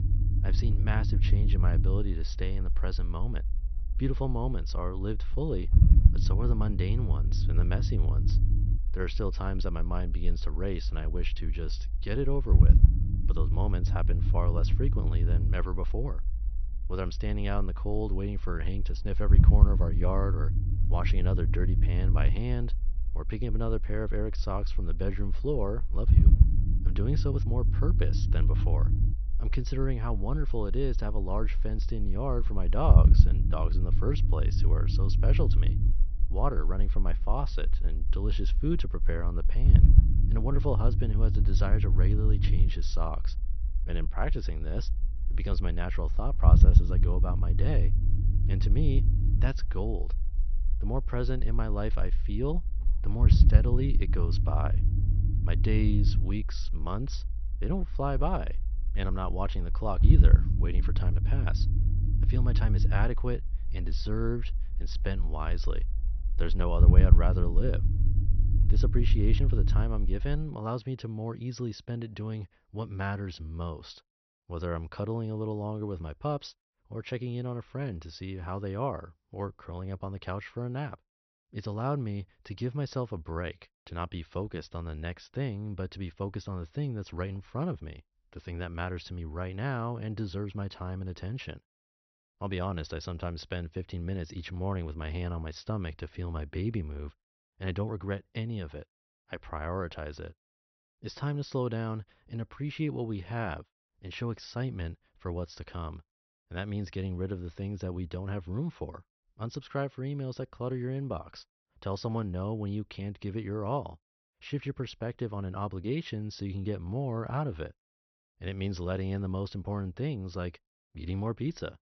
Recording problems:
high frequencies cut off; noticeable; nothing above 6 kHz
low rumble; loud; until 1:10; 5 dB below the speech

